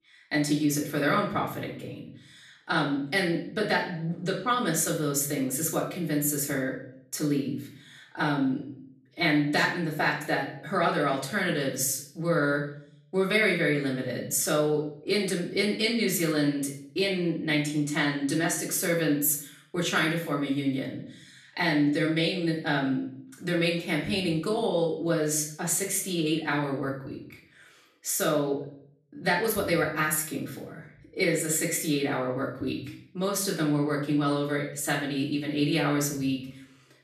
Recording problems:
off-mic speech; far
room echo; slight; dies away in 0.5 s

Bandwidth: 13.5 kHz